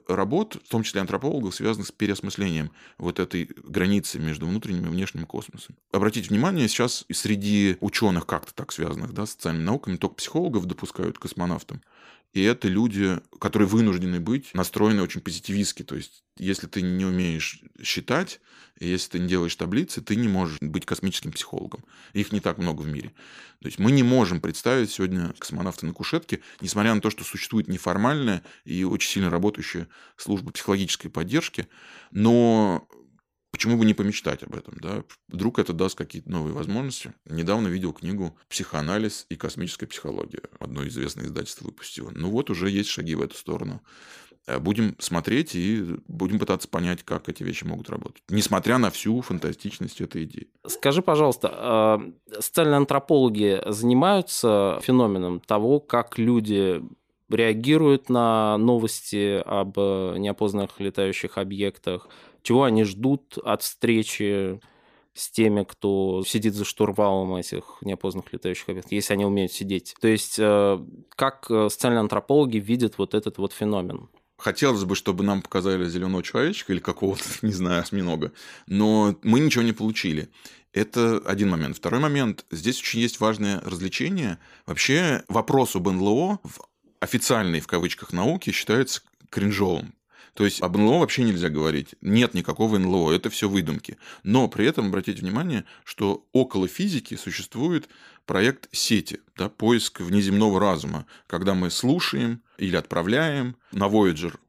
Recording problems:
none

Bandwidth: 15 kHz